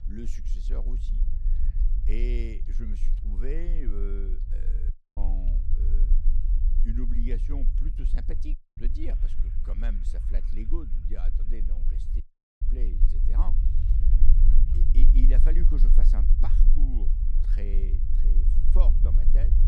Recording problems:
low rumble; loud; throughout; 5 dB below the speech
household noises; faint; throughout; 30 dB below the speech
audio cutting out; at 5 s, at 8.5 s and at 12 s

